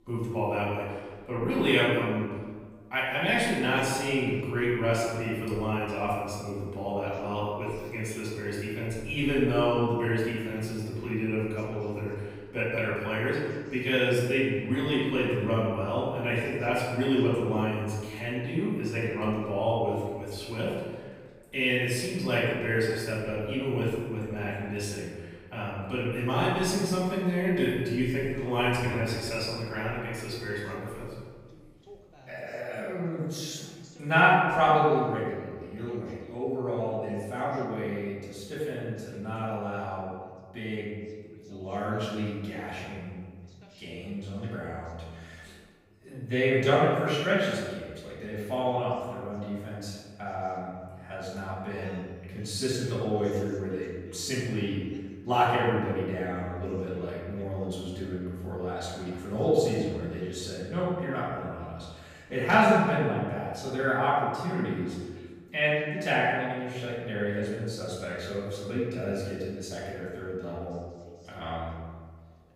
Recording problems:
room echo; strong; dies away in 1.3 s
off-mic speech; far
voice in the background; faint; throughout; 25 dB below the speech

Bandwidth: 15.5 kHz